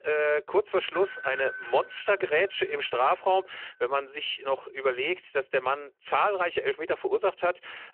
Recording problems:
phone-call audio
doorbell; noticeable; from 1 to 3 s; peak 7 dB below the speech

